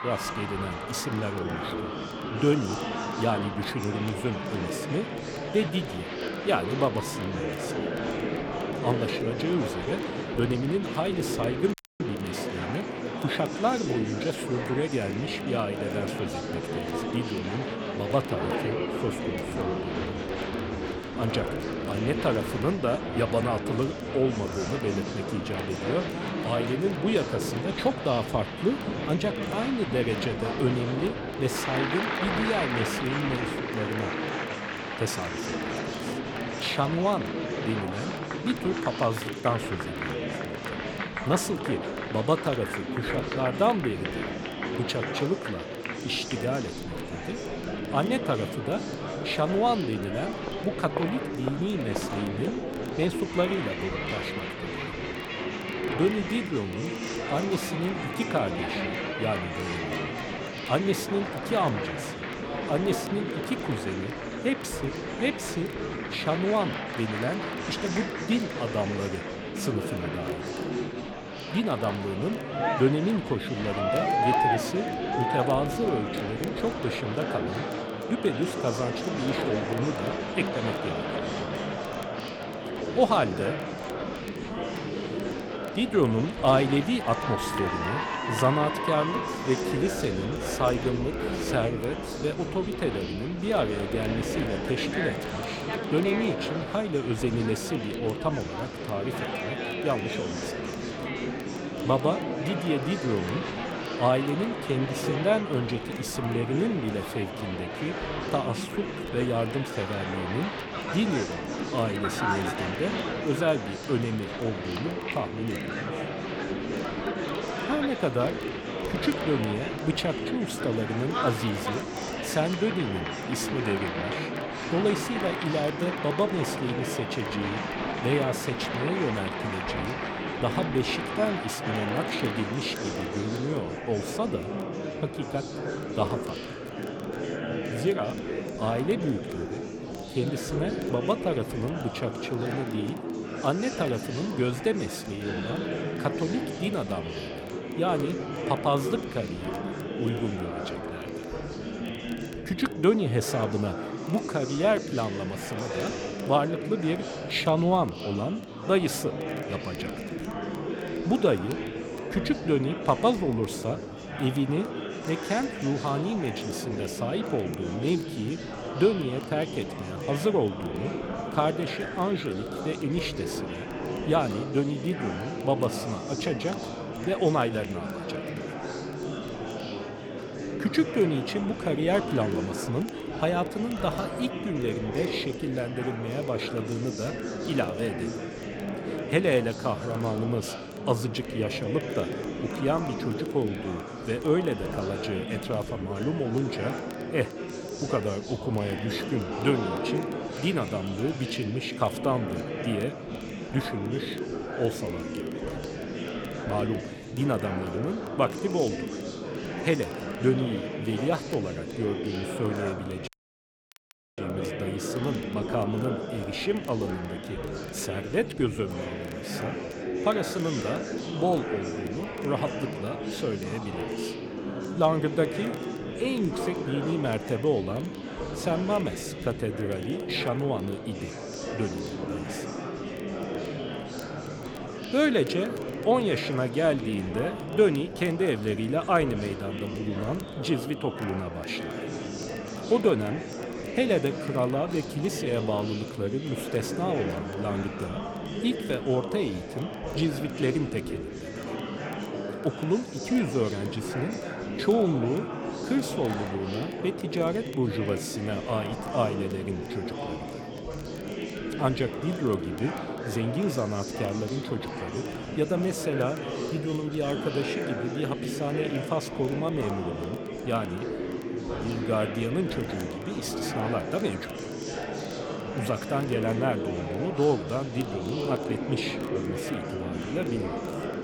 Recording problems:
murmuring crowd; loud; throughout; 3 dB below the speech
crackle, like an old record; faint; 25 dB below the speech
audio cutting out; at 12 s and at 3:33 for 1 s

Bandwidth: 18.5 kHz